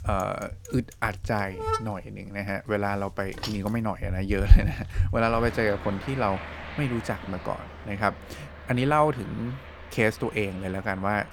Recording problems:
traffic noise; loud; throughout; 3 dB below the speech

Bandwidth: 18.5 kHz